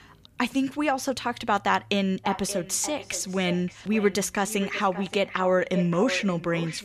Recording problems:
echo of what is said; noticeable; from 2 s on; 580 ms later, 15 dB below the speech

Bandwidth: 15 kHz